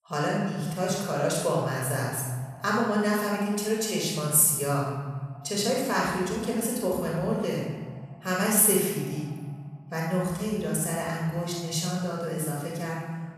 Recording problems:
room echo; strong; dies away in 1.4 s
off-mic speech; far
echo of what is said; faint; throughout; 110 ms later, 25 dB below the speech

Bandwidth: 13.5 kHz